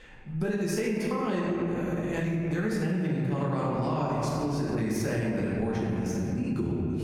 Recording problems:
room echo; strong; dies away in 2.2 s
off-mic speech; far
squashed, flat; somewhat
electrical hum; noticeable; from 1.5 to 3 s and from 3.5 to 6 s; 60 Hz, 15 dB below the speech

